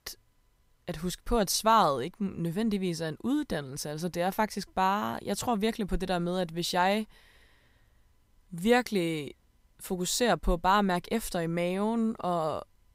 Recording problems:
none

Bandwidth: 15.5 kHz